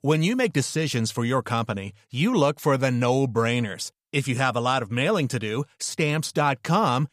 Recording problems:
none

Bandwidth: 15 kHz